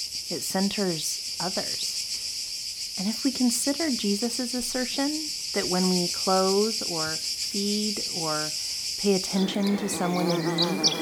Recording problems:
animal sounds; very loud; throughout; as loud as the speech

